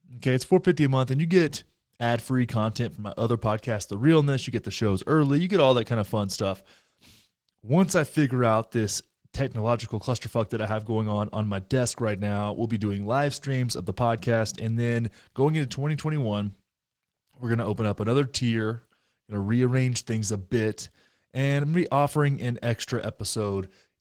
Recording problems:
garbled, watery; slightly

